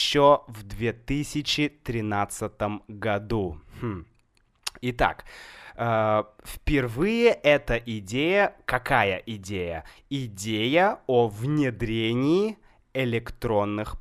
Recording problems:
abrupt cut into speech; at the start

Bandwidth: 15 kHz